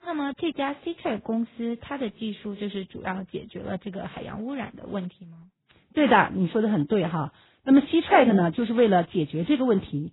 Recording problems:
garbled, watery; badly; nothing above 4 kHz

